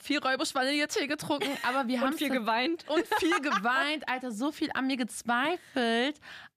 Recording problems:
none

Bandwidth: 14.5 kHz